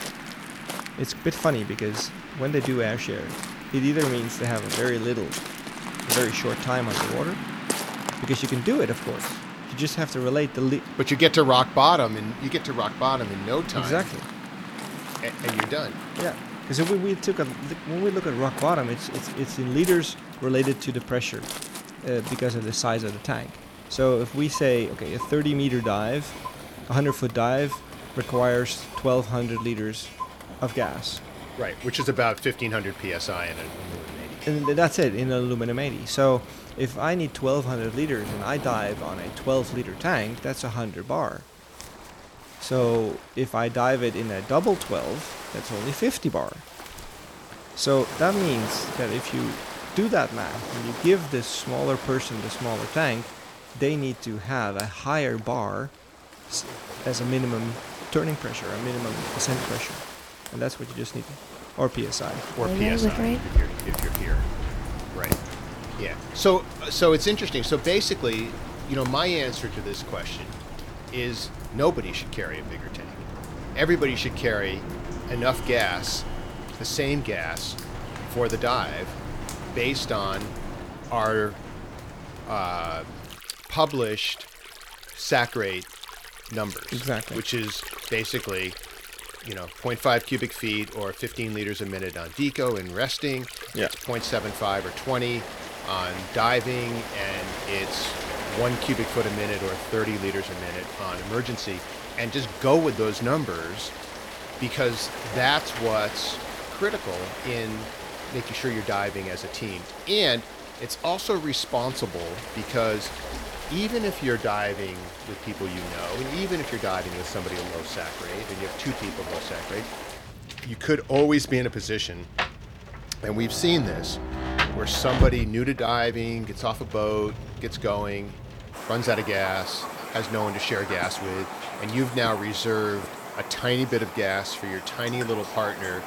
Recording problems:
rain or running water; loud; throughout; 8 dB below the speech
household noises; noticeable; until 1:23; 15 dB below the speech

